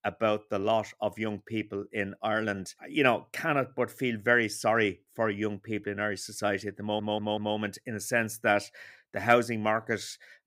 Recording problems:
audio stuttering; at 7 s

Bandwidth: 15.5 kHz